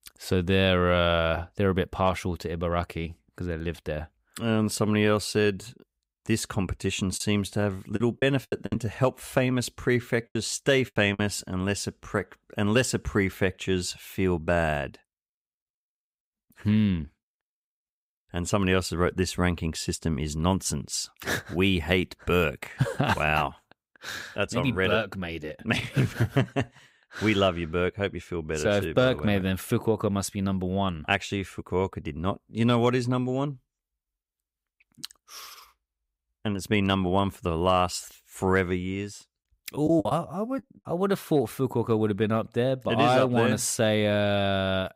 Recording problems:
choppy; very; from 7 to 11 s and at 40 s; 10% of the speech affected

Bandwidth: 15.5 kHz